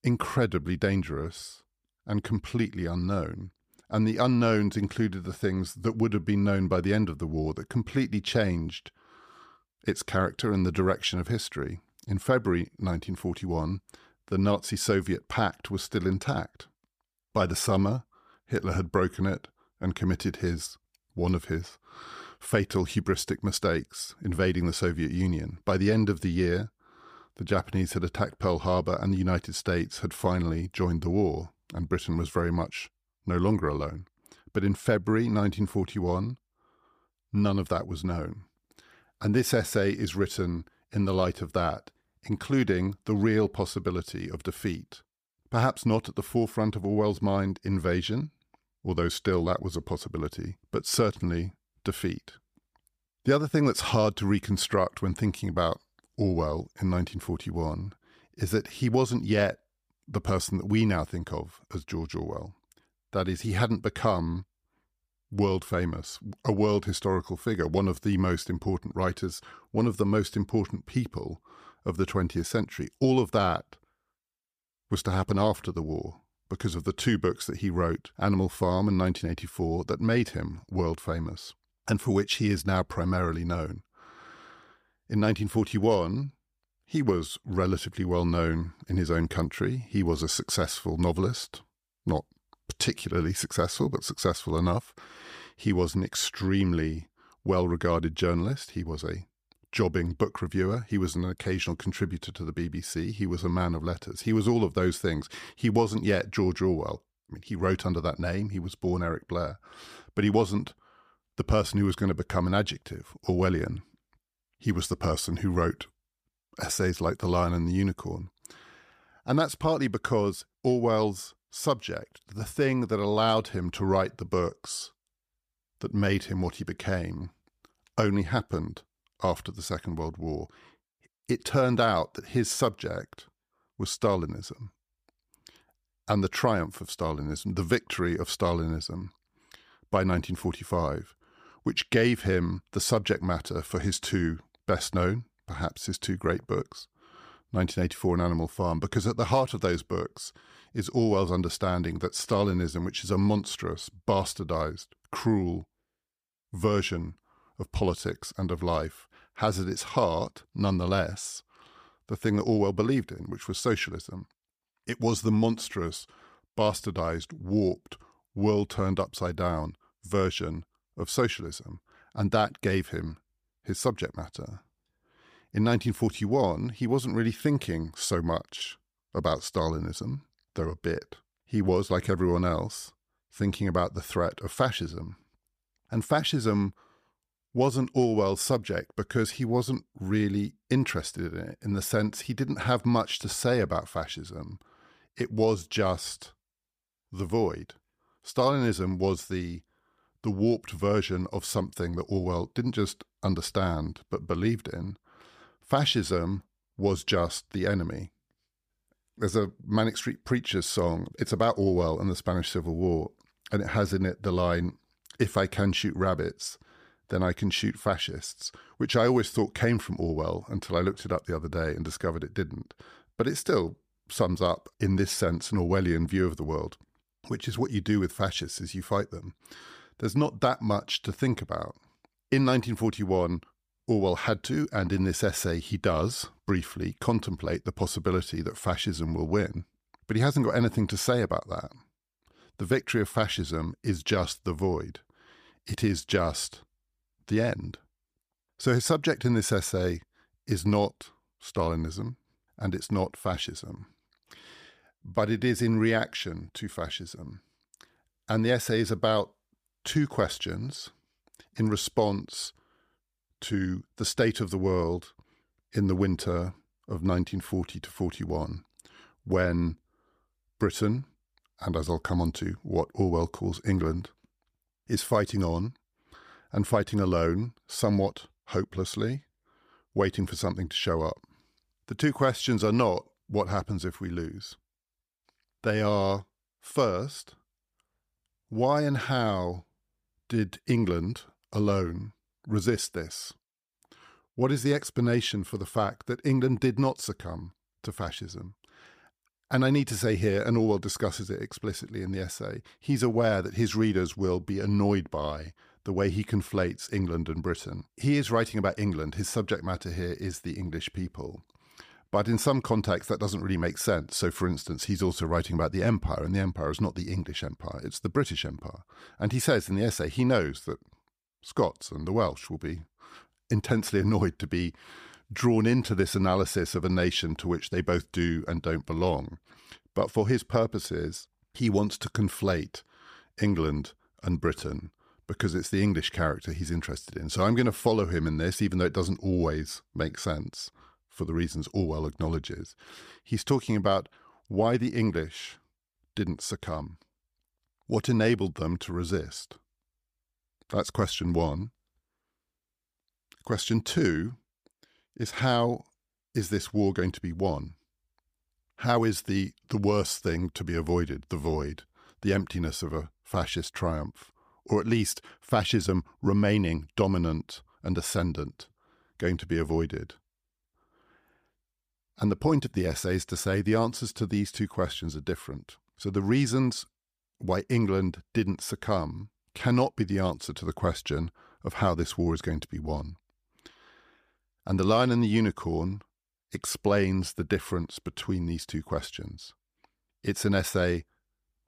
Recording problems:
none

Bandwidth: 15 kHz